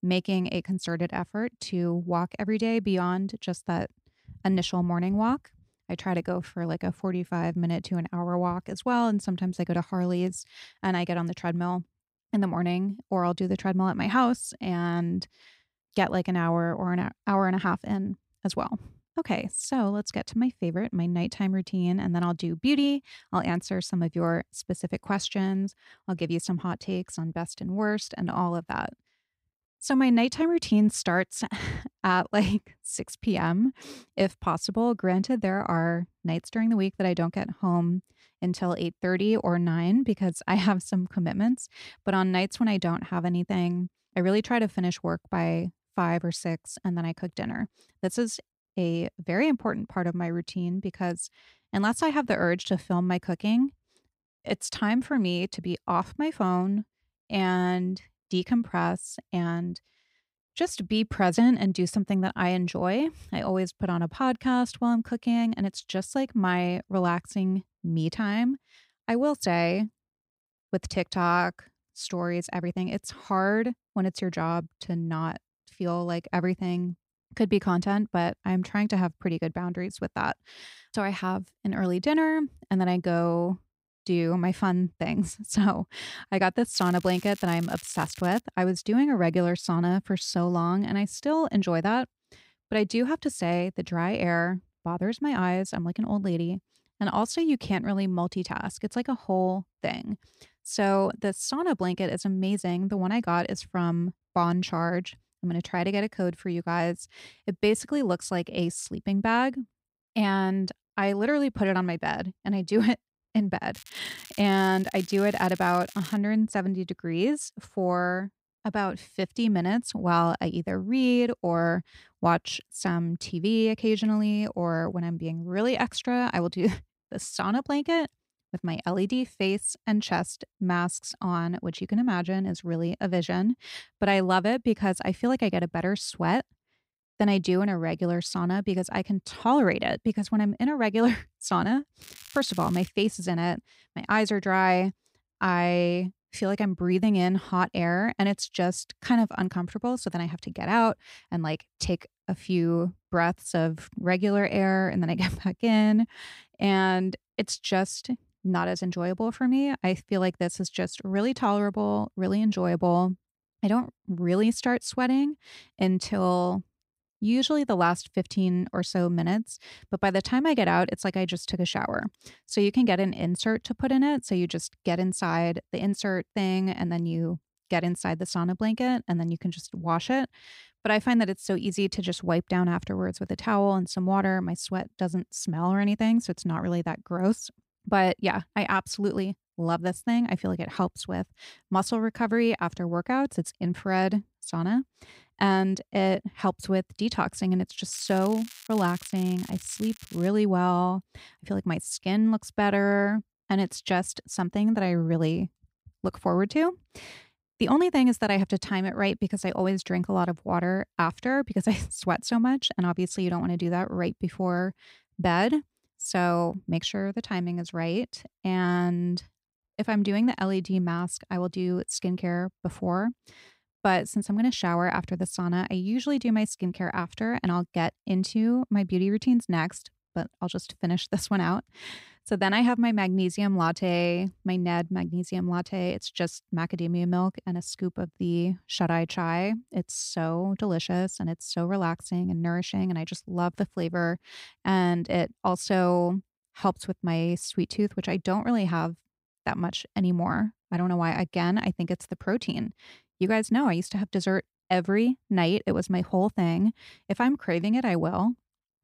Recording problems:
crackling; noticeable; 4 times, first at 1:27; 20 dB below the speech

